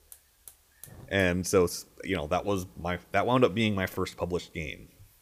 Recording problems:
hiss; faint; throughout; 25 dB below the speech

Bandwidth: 15 kHz